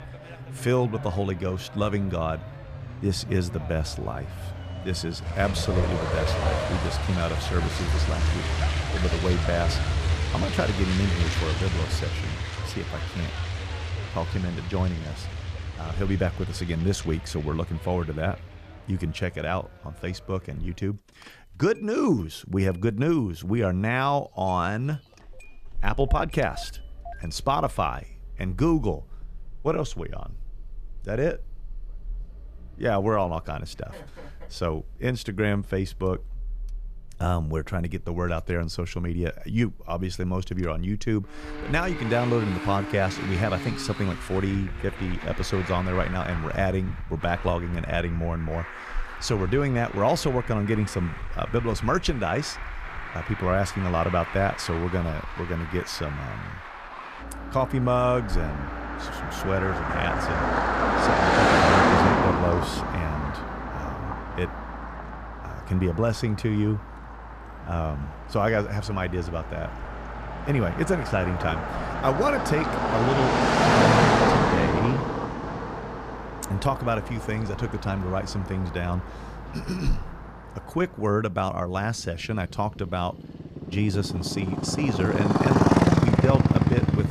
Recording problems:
traffic noise; loud; throughout; as loud as the speech

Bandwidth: 14.5 kHz